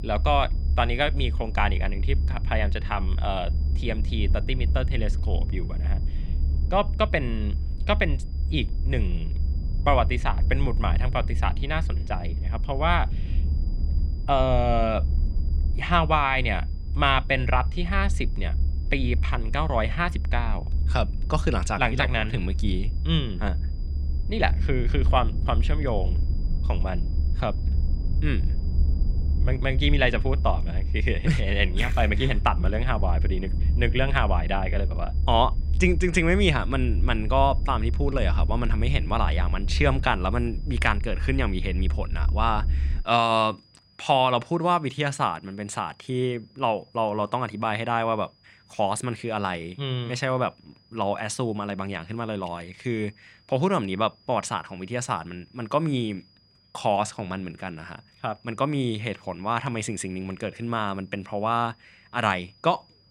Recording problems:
low rumble; noticeable; until 43 s; 20 dB below the speech
high-pitched whine; faint; throughout; 5 kHz, 30 dB below the speech

